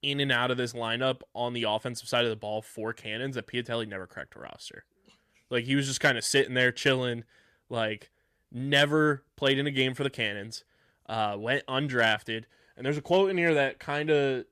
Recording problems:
none

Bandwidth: 14.5 kHz